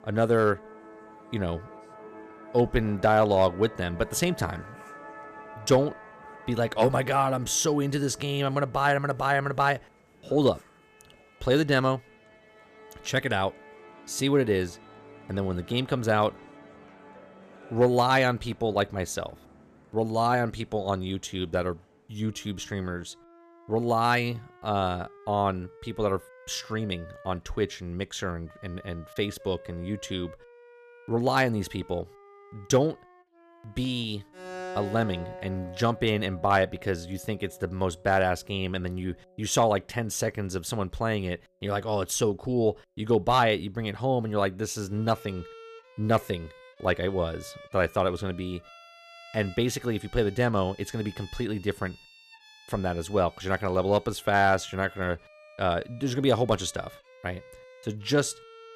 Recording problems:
background music; faint; throughout; 20 dB below the speech

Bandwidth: 14.5 kHz